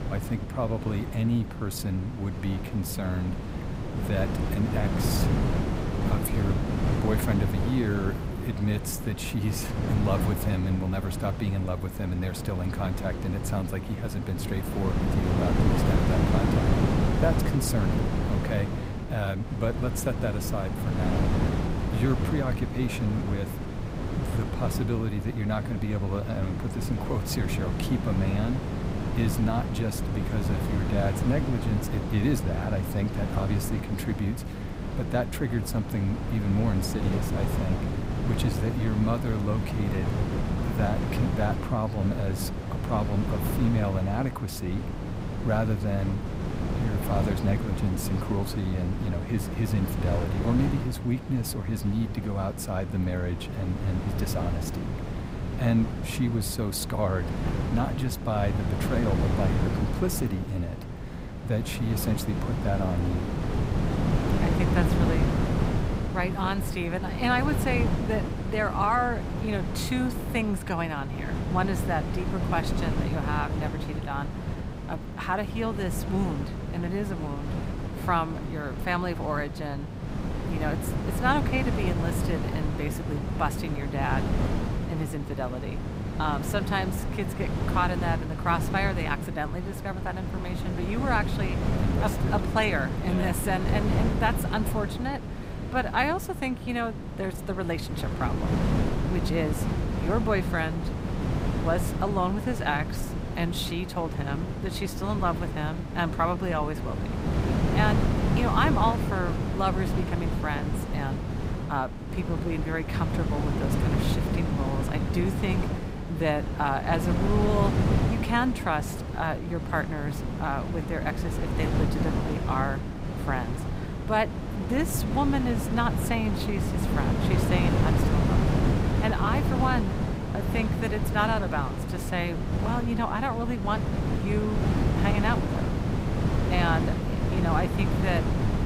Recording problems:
wind noise on the microphone; heavy; 4 dB below the speech

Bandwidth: 15.5 kHz